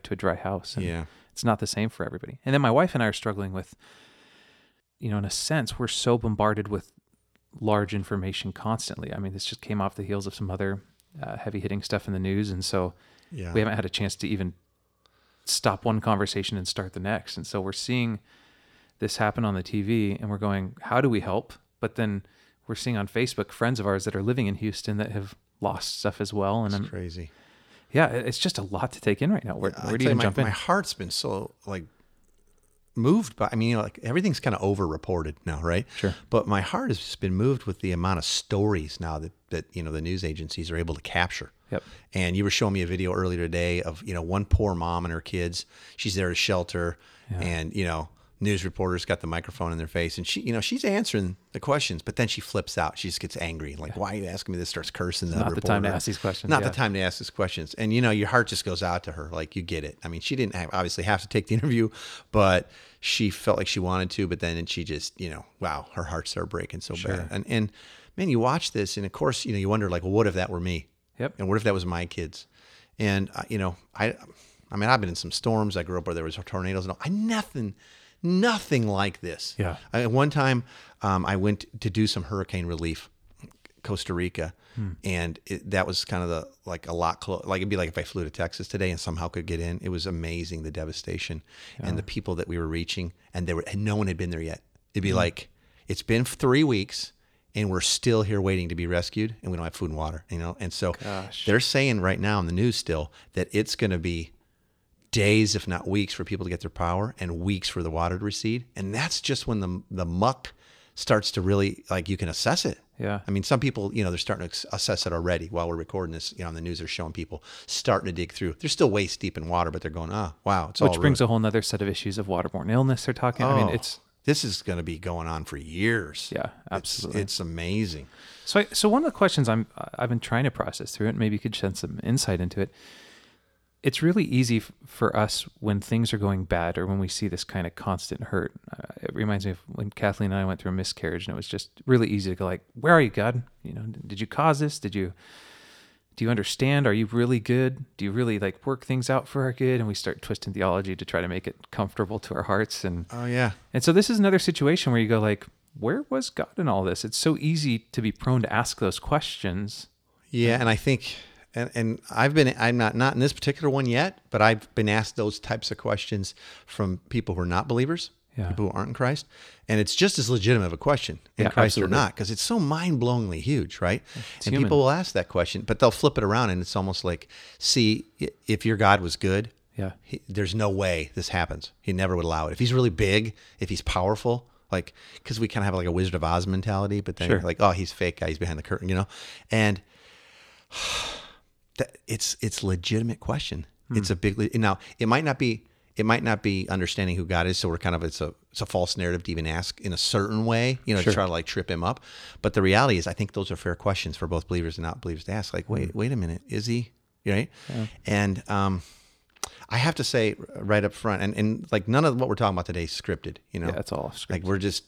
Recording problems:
none

